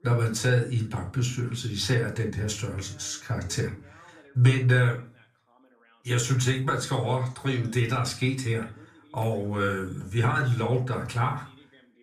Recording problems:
room echo; slight; dies away in 0.3 s
off-mic speech; somewhat distant
voice in the background; faint; throughout; 30 dB below the speech

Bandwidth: 14.5 kHz